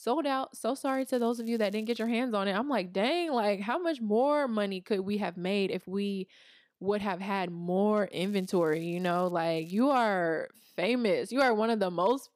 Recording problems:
crackling; faint; from 1 to 2 s, from 8 to 9.5 s and at 9.5 s; 30 dB below the speech

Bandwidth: 15 kHz